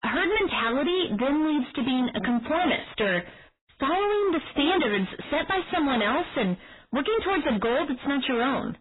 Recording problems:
distortion; heavy; 36% of the sound clipped
garbled, watery; badly; nothing above 4 kHz

